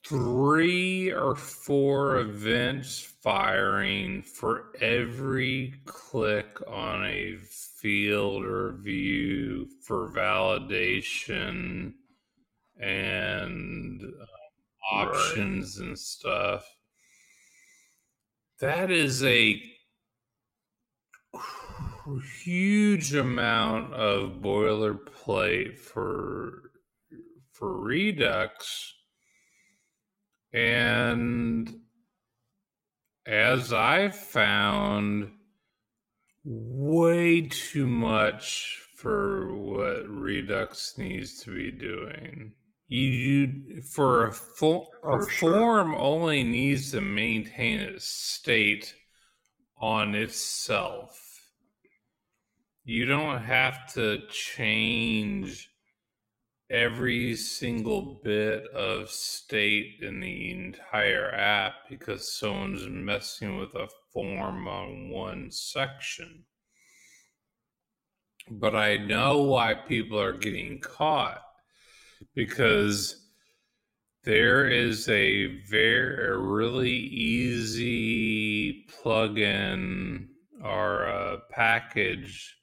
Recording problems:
wrong speed, natural pitch; too slow; 0.5 times normal speed

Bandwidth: 16.5 kHz